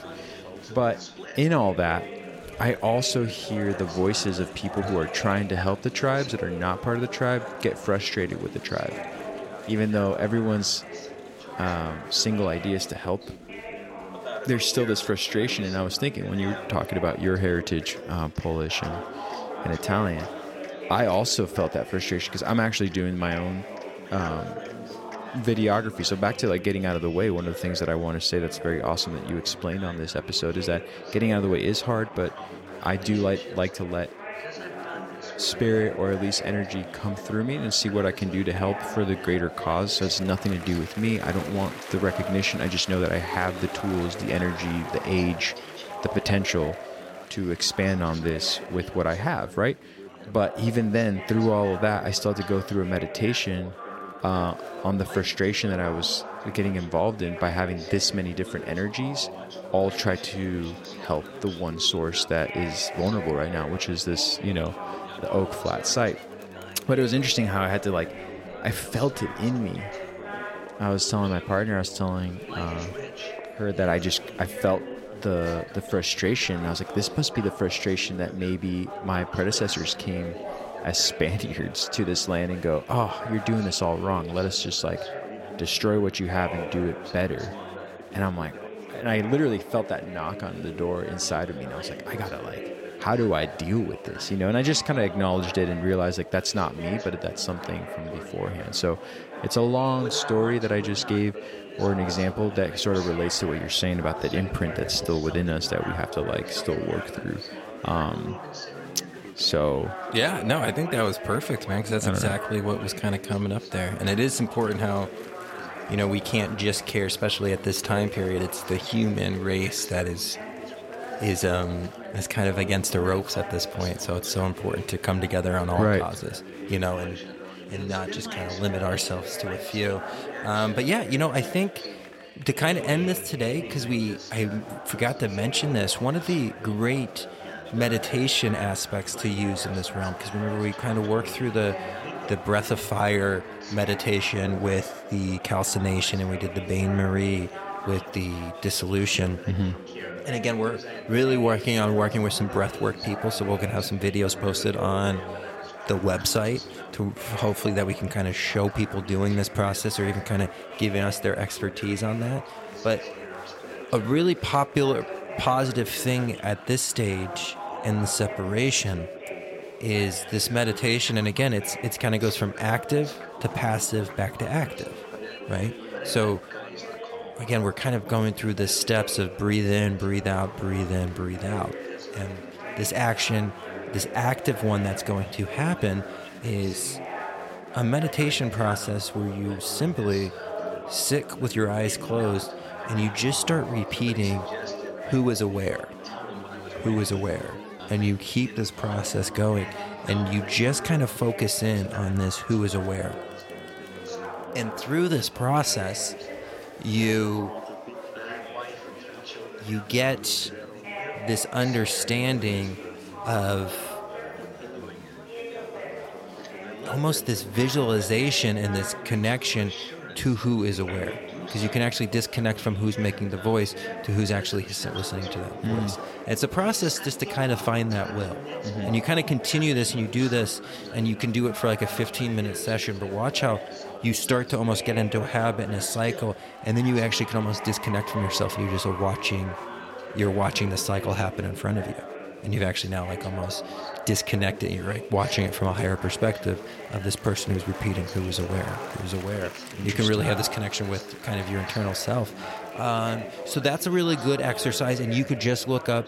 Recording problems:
chatter from many people; noticeable; throughout; 10 dB below the speech

